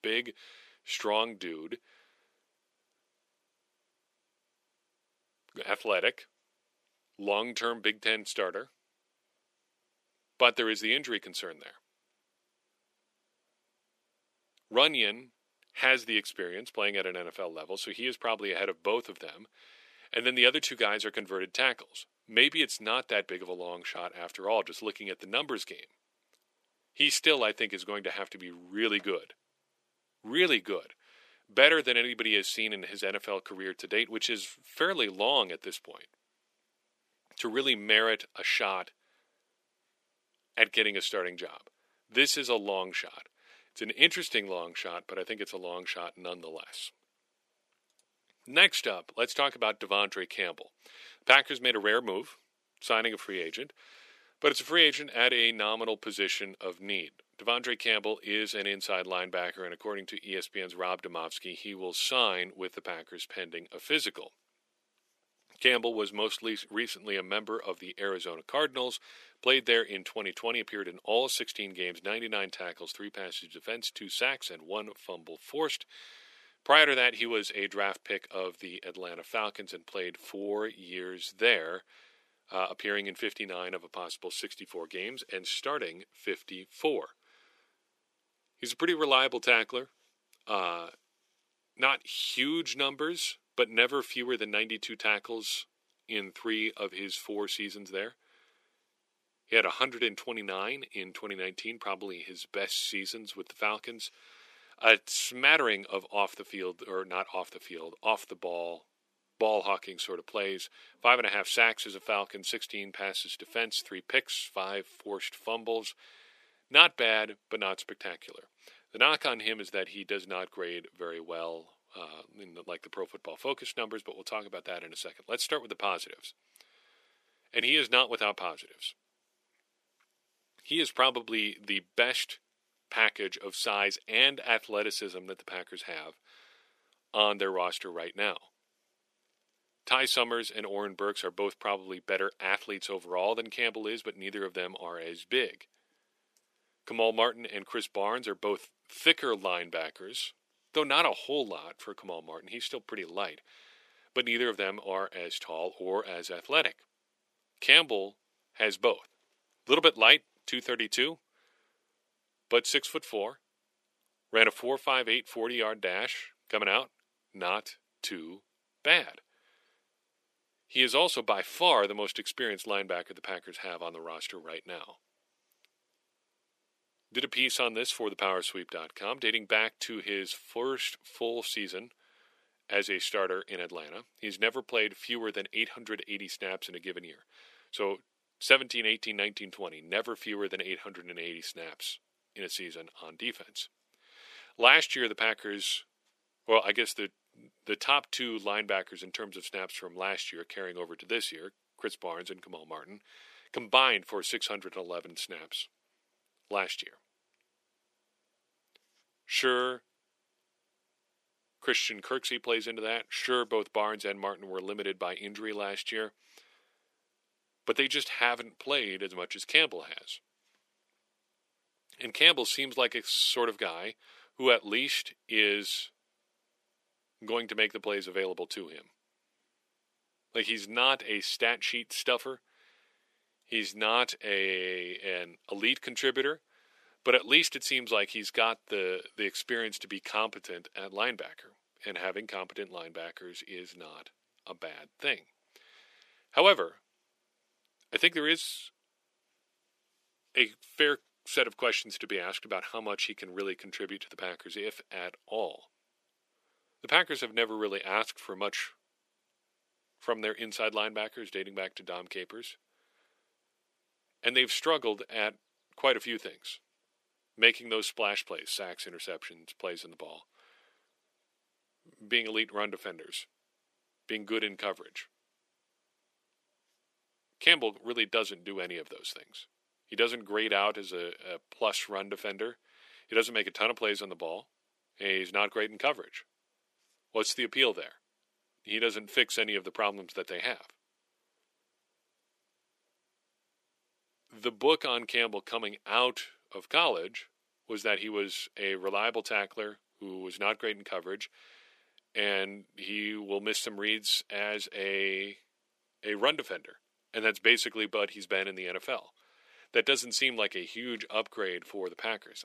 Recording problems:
thin; somewhat; fading below 350 Hz

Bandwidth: 14.5 kHz